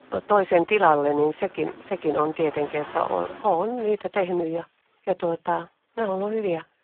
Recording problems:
phone-call audio; poor line
traffic noise; noticeable; throughout; 20 dB below the speech

